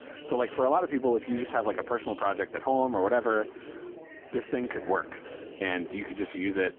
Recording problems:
phone-call audio; poor line; nothing above 3.5 kHz
chatter from many people; noticeable; throughout; 15 dB below the speech
traffic noise; faint; throughout; 25 dB below the speech

